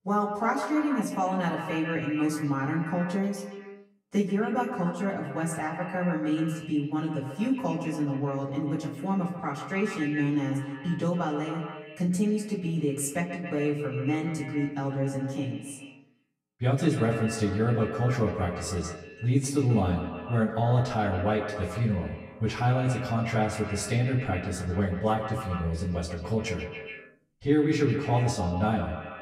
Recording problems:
echo of what is said; strong; throughout; 130 ms later, 8 dB below the speech
off-mic speech; far
room echo; very slight; dies away in 0.2 s

